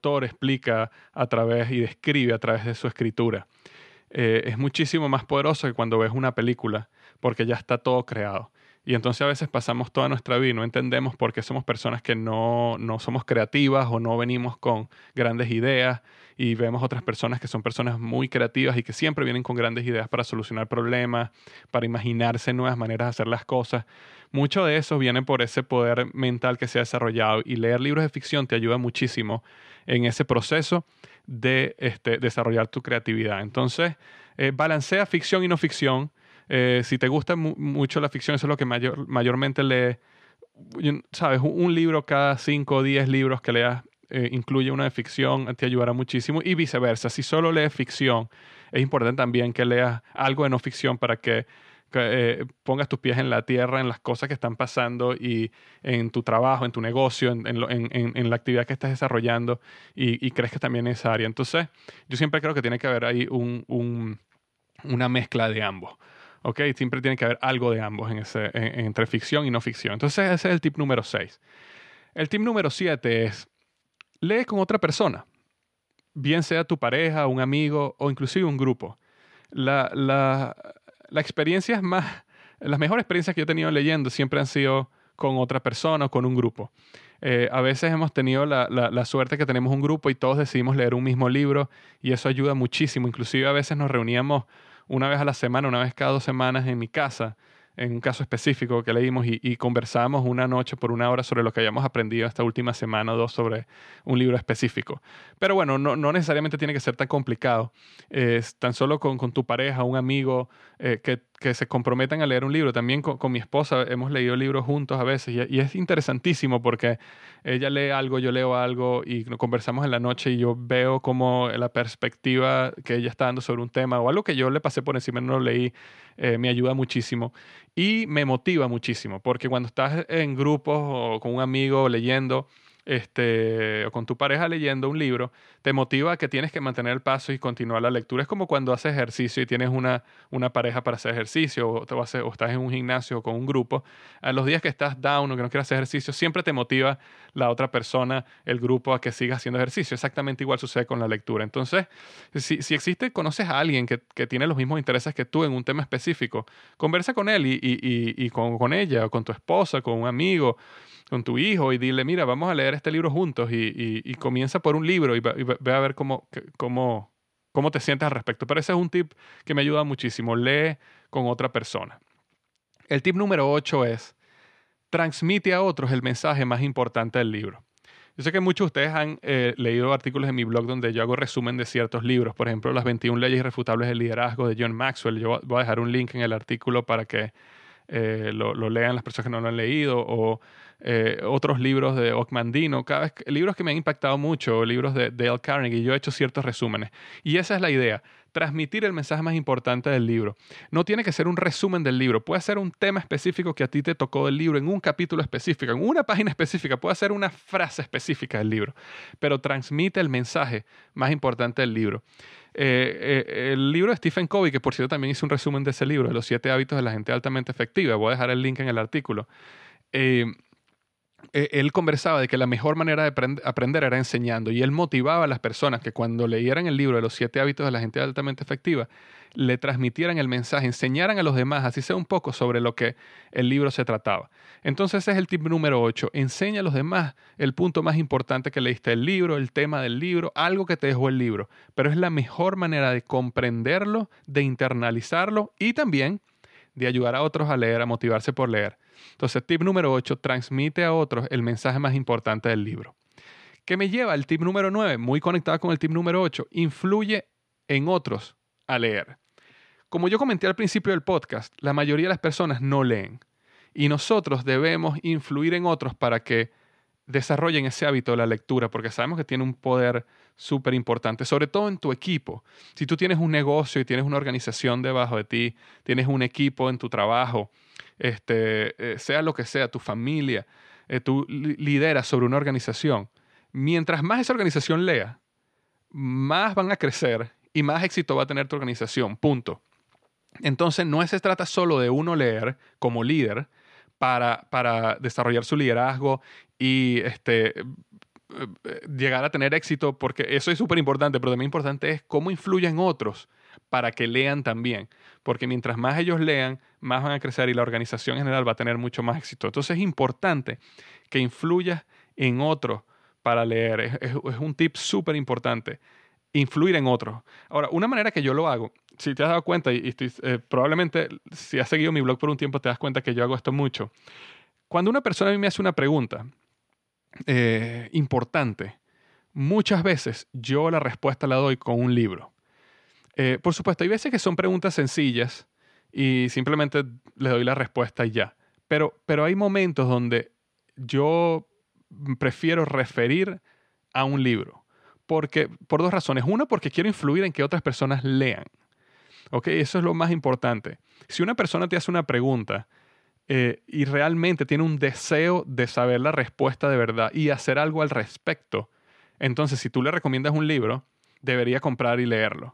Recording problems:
none

